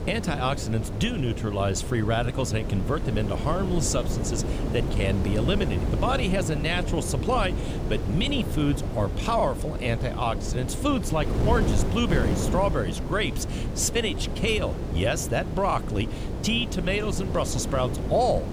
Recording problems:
wind noise on the microphone; heavy; 8 dB below the speech

